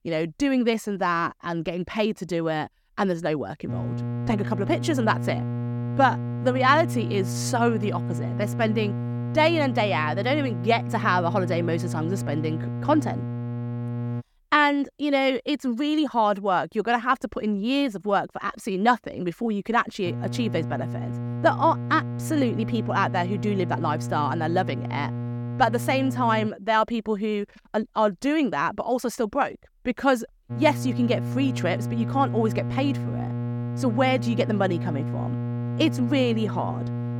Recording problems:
electrical hum; noticeable; from 3.5 to 14 s, from 20 to 26 s and from 31 s on; 60 Hz, 15 dB below the speech

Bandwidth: 17.5 kHz